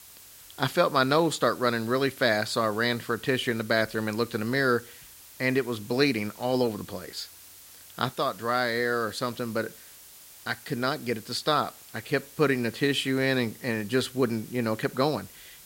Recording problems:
hiss; noticeable; throughout; 20 dB below the speech

